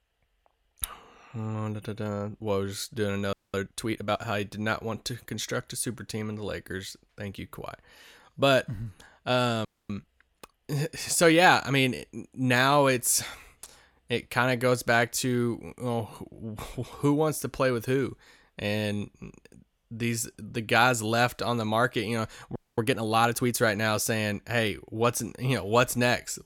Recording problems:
audio freezing; at 3.5 s, at 9.5 s and at 23 s

